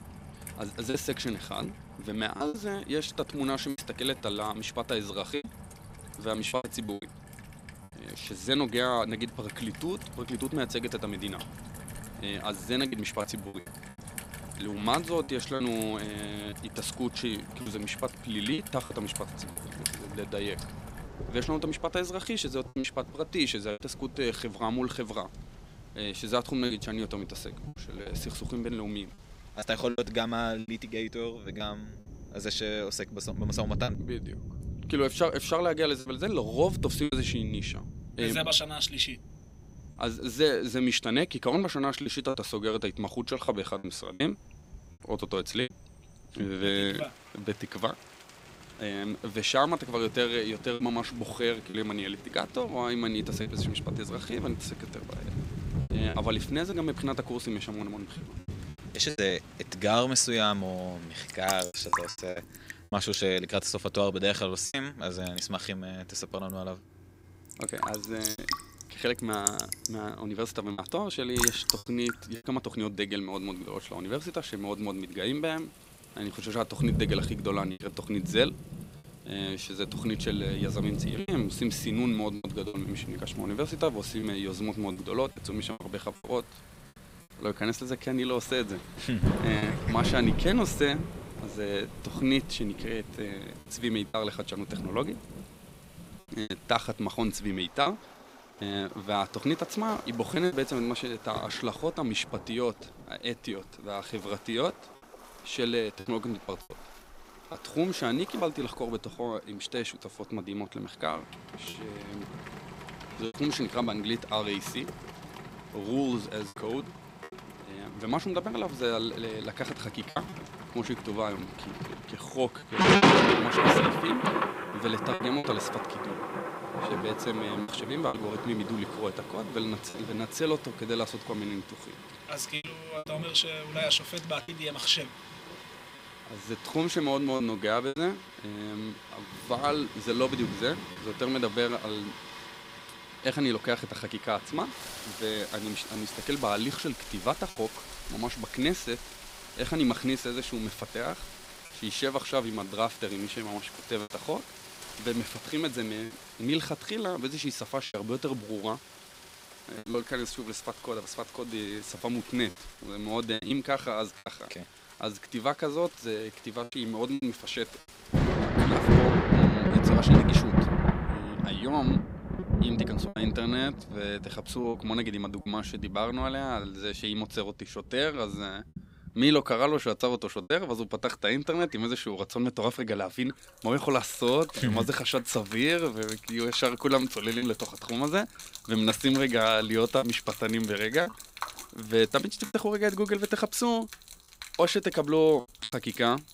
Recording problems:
rain or running water; loud; throughout; 3 dB below the speech
choppy; occasionally; 4% of the speech affected

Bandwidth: 15.5 kHz